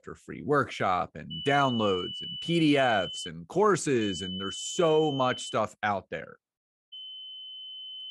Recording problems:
high-pitched whine; loud; from 1.5 to 3.5 s, from 4 to 5.5 s and from 7 s on; 3 kHz, 9 dB below the speech

